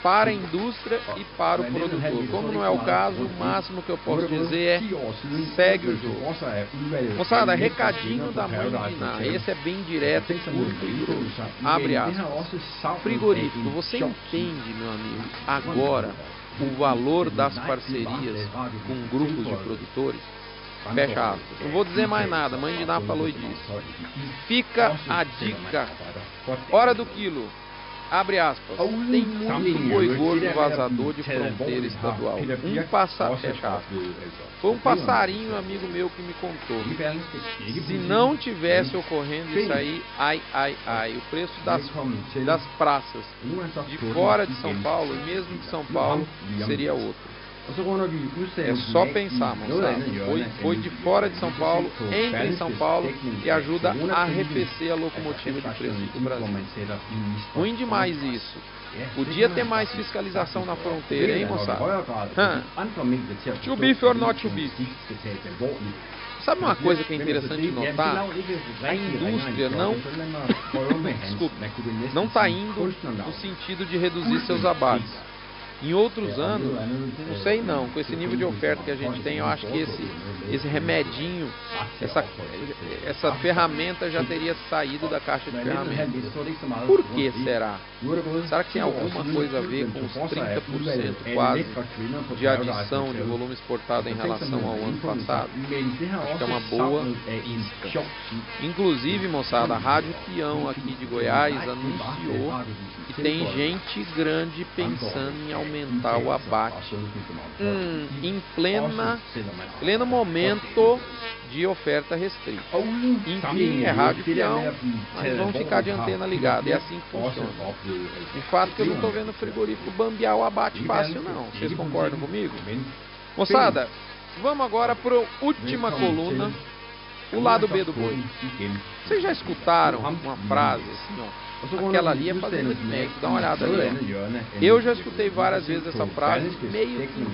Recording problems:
high frequencies cut off; noticeable; nothing above 5.5 kHz
voice in the background; loud; throughout; 5 dB below the speech
electrical hum; noticeable; throughout; 50 Hz, 10 dB below the speech

